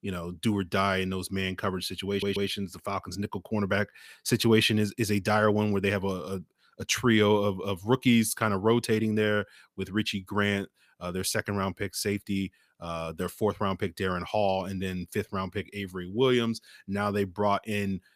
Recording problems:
audio stuttering; at 2 s

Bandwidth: 15 kHz